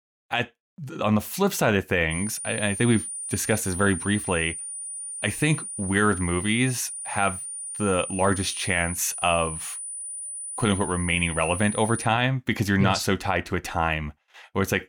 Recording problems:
high-pitched whine; loud; from 2 to 12 s; 9.5 kHz, 7 dB below the speech

